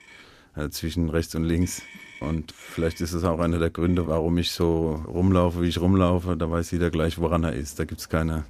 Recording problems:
traffic noise; faint; throughout; 20 dB below the speech

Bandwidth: 15 kHz